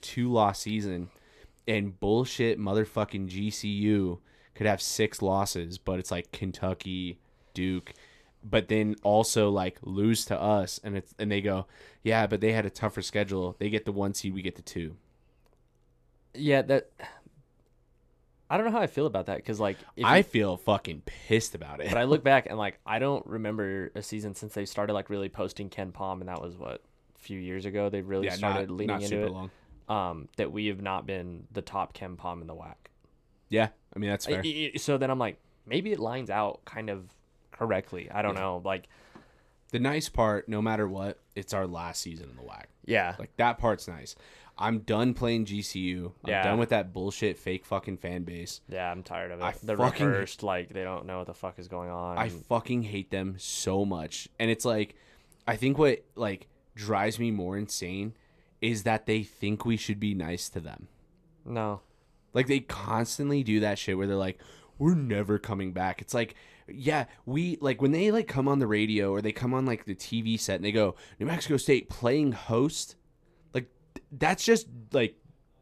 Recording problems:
none

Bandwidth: 14 kHz